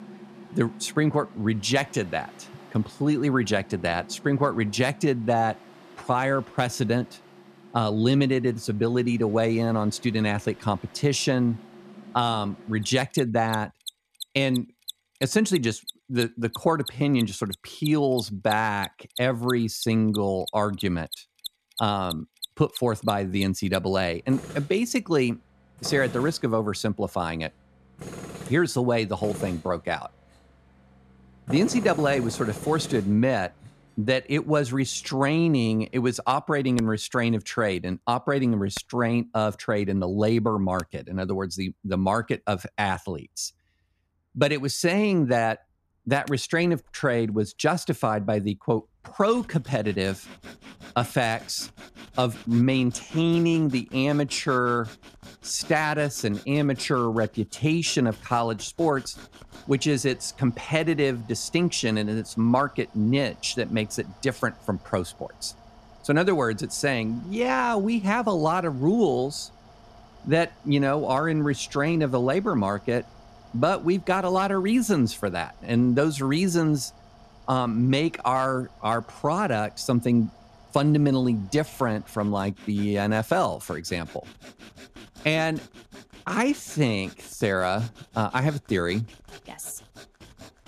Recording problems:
machinery noise; noticeable; throughout; 20 dB below the speech

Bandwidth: 14 kHz